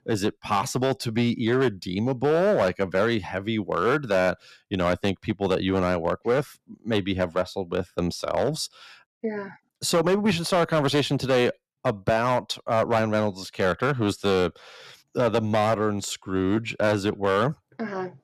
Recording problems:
distortion; slight; 6% of the sound clipped

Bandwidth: 14 kHz